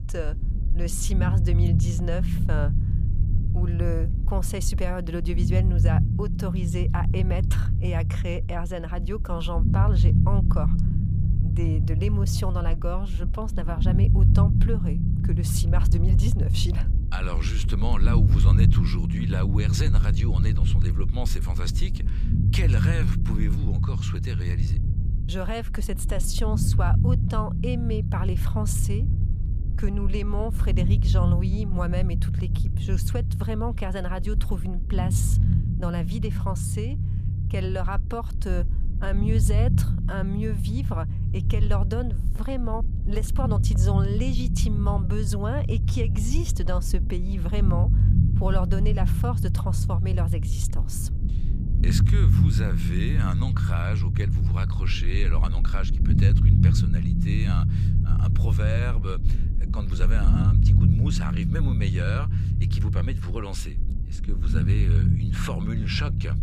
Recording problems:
low rumble; loud; throughout; 3 dB below the speech

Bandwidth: 15 kHz